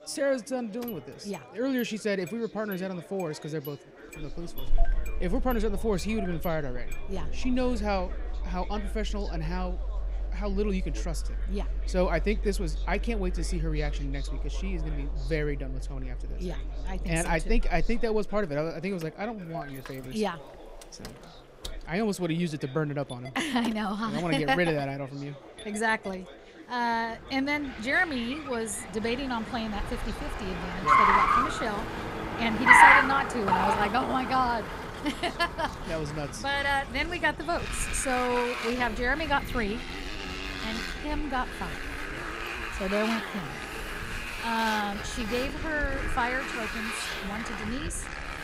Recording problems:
traffic noise; very loud; throughout; 1 dB above the speech
chatter from many people; noticeable; throughout; 20 dB below the speech

